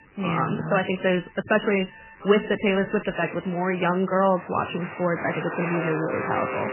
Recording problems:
garbled, watery; badly; nothing above 3 kHz
alarms or sirens; noticeable; throughout; 10 dB below the speech

